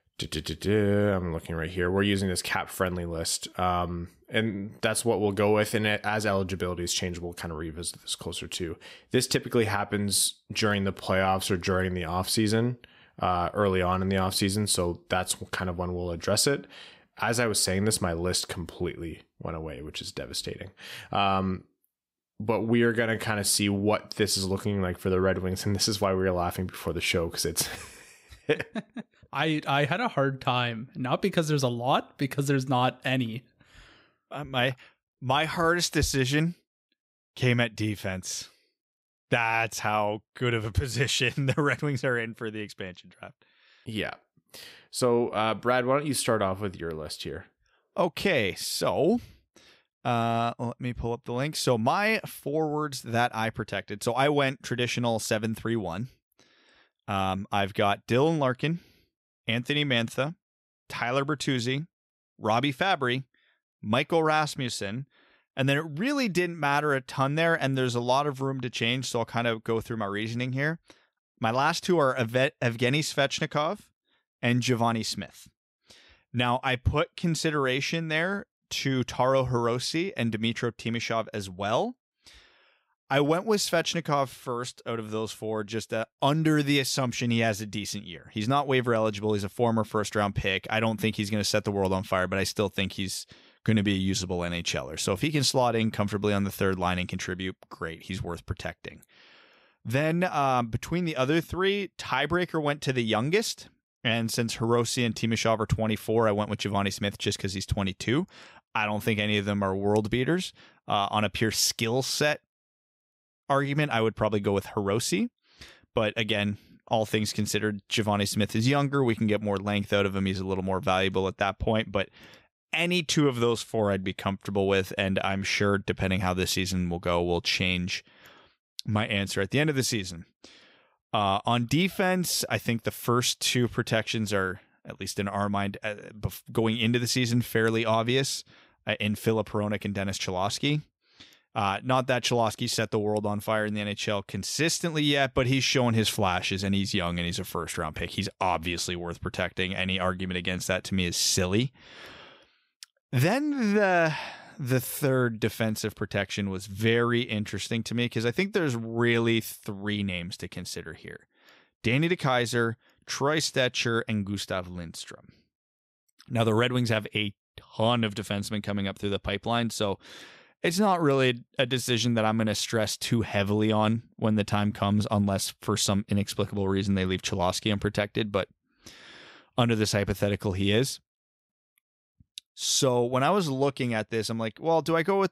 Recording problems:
none

